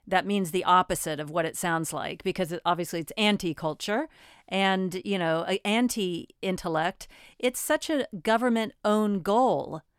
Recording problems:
none

